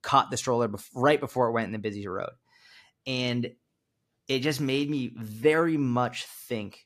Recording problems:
none

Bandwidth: 14.5 kHz